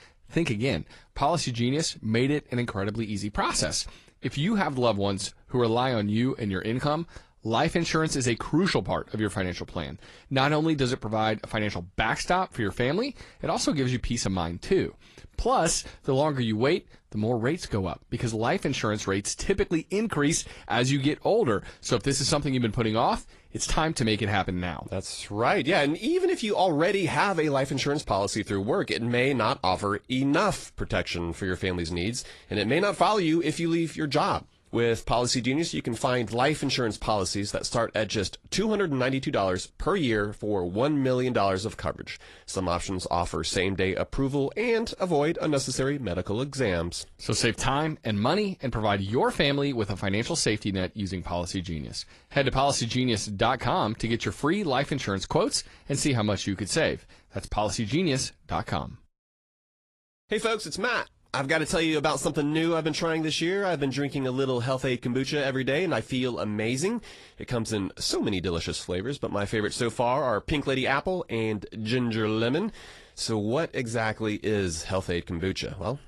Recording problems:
garbled, watery; slightly

